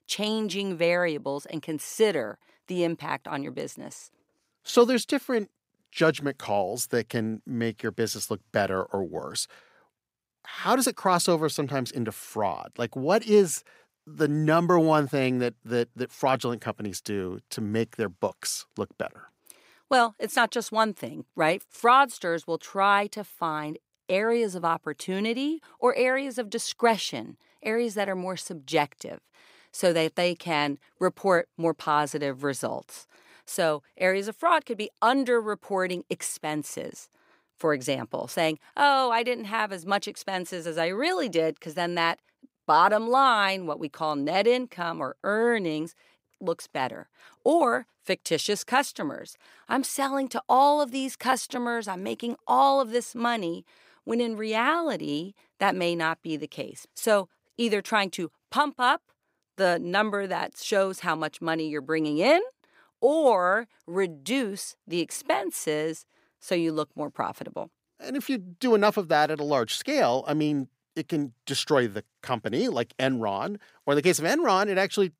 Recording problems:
none

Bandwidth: 15.5 kHz